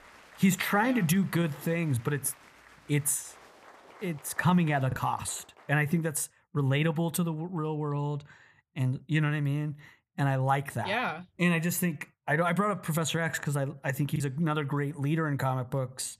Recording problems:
crowd noise; faint; until 5.5 s; 25 dB below the speech
choppy; occasionally; at 5 s and at 14 s; 2% of the speech affected

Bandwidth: 14.5 kHz